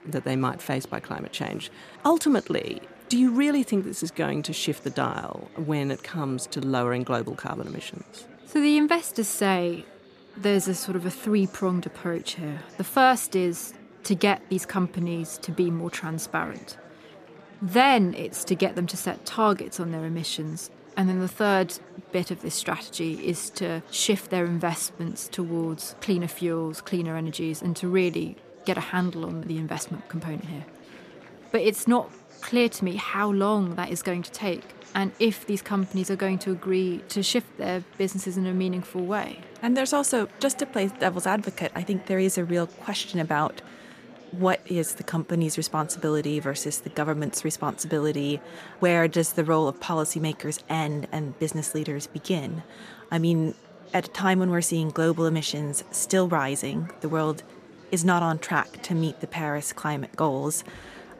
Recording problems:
murmuring crowd; faint; throughout; 20 dB below the speech

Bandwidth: 14.5 kHz